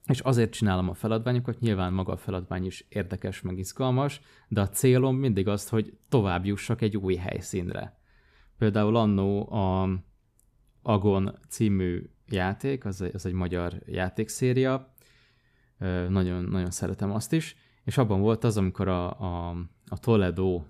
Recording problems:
none

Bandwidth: 14.5 kHz